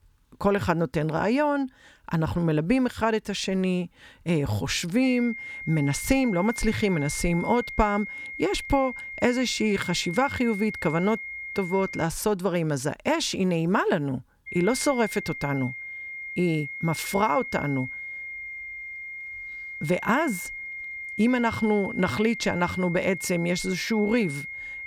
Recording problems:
high-pitched whine; loud; from 5 to 12 s and from 14 s on; 2 kHz, 9 dB below the speech

